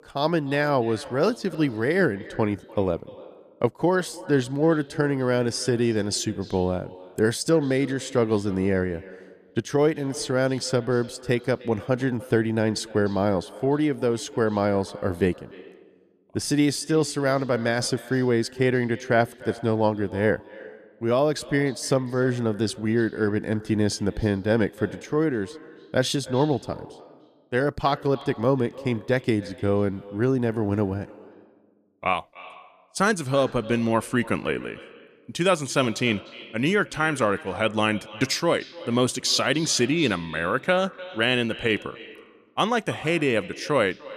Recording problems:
echo of what is said; faint; throughout; 300 ms later, 20 dB below the speech

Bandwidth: 14.5 kHz